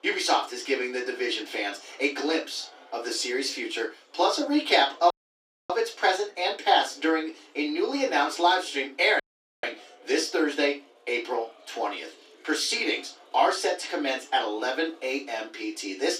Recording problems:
off-mic speech; far
thin; somewhat; fading below 250 Hz
room echo; slight; dies away in 0.2 s
murmuring crowd; faint; throughout; 25 dB below the speech
audio cutting out; at 5 s for 0.5 s and at 9 s

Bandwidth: 14.5 kHz